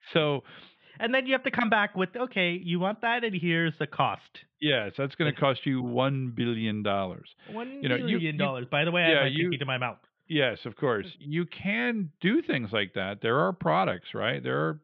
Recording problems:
muffled; very; fading above 3.5 kHz

